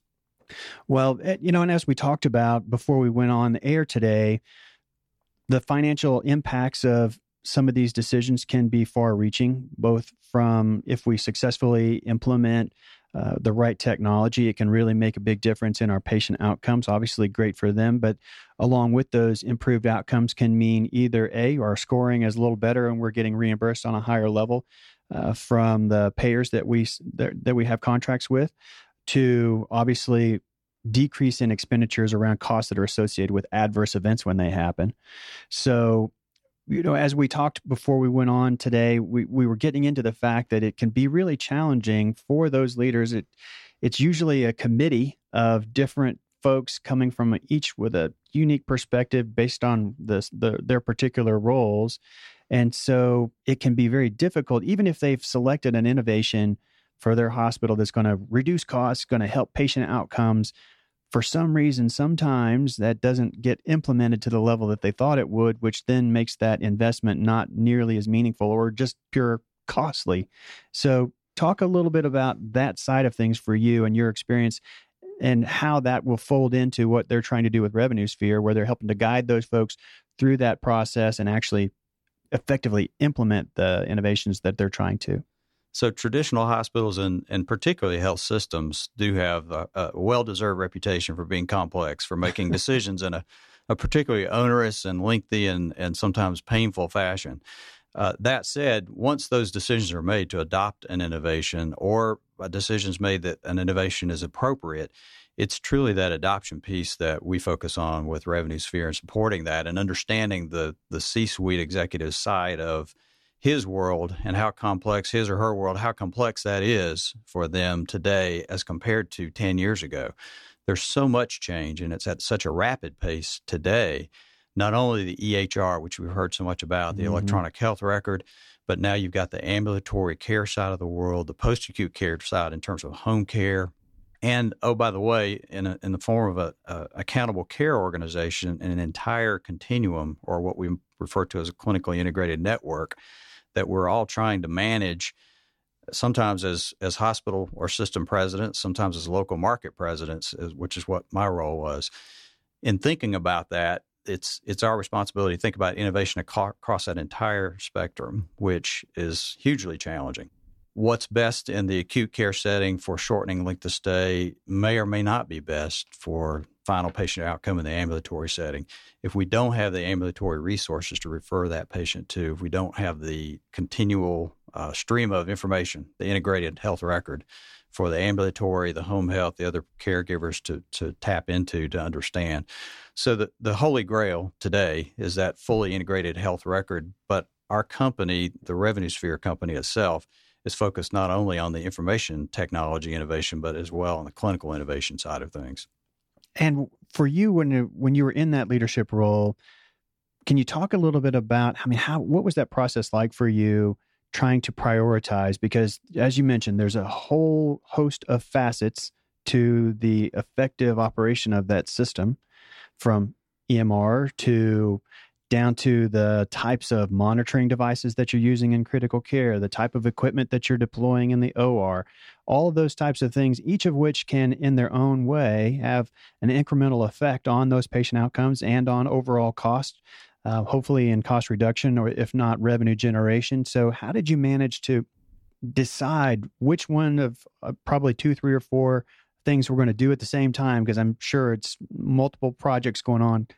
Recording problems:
none

